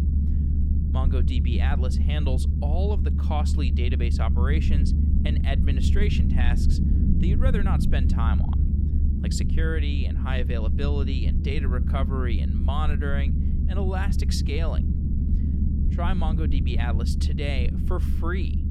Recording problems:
low rumble; loud; throughout; 4 dB below the speech

